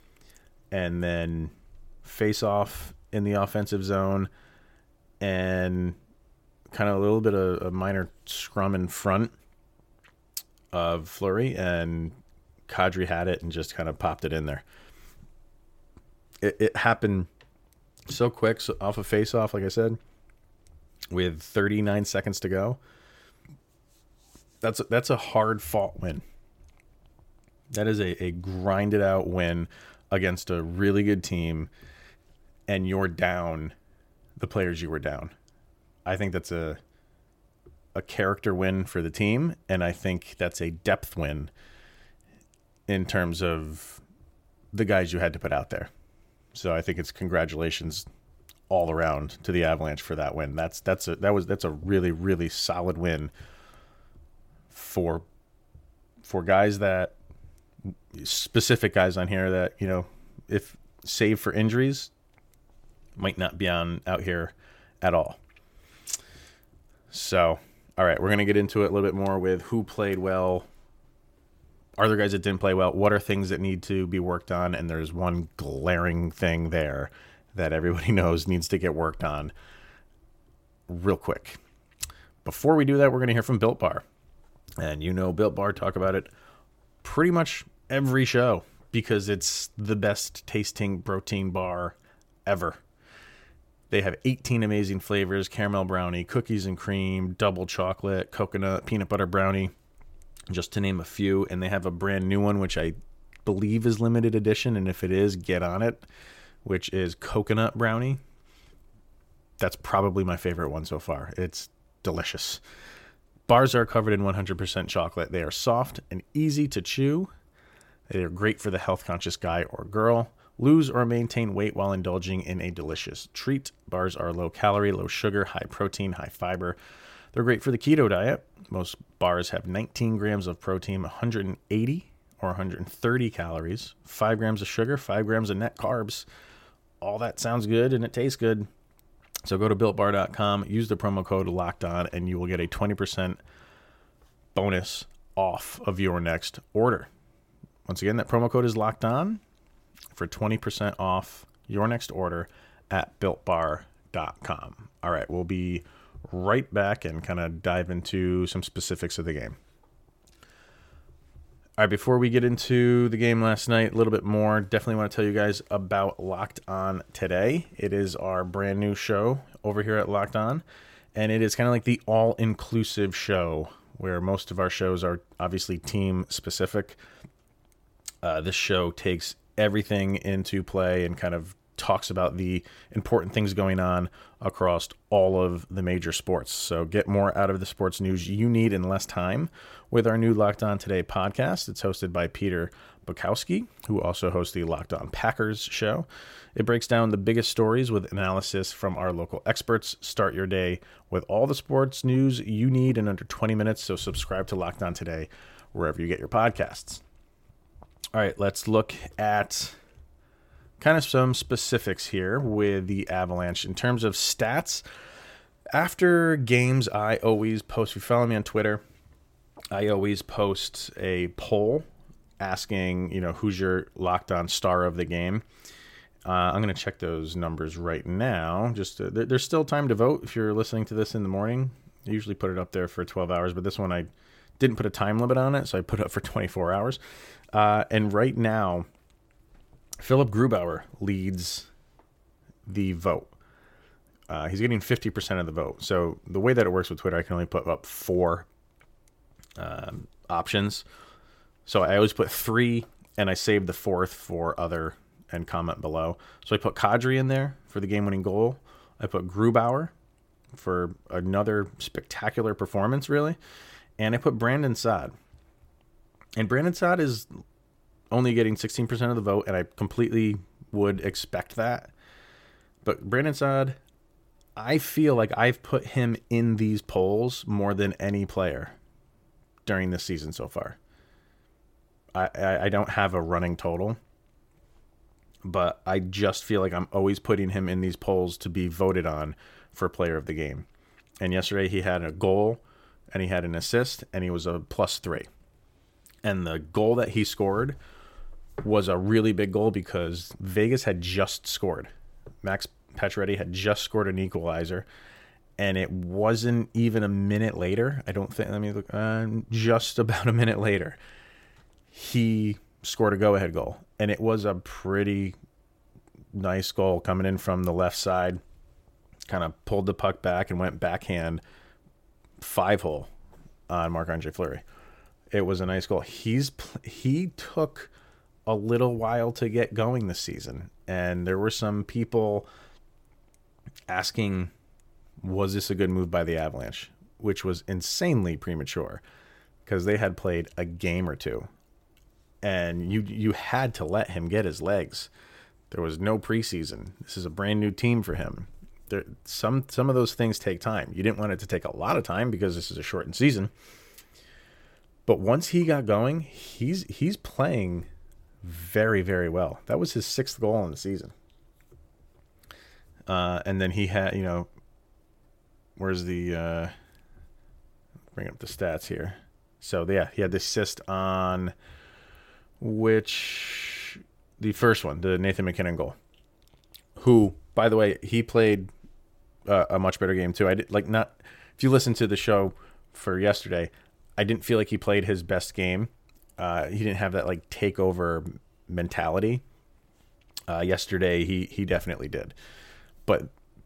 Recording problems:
none

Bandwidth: 16.5 kHz